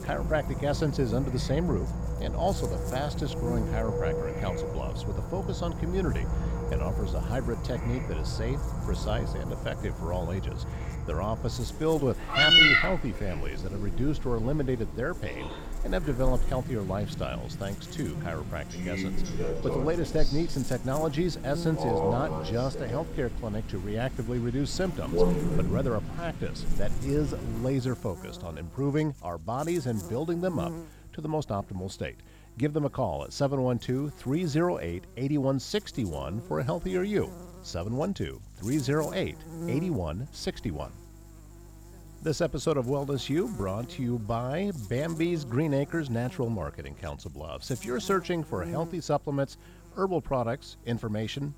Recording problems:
animal sounds; very loud; until 28 s; 1 dB above the speech
electrical hum; noticeable; throughout; 50 Hz, 15 dB below the speech

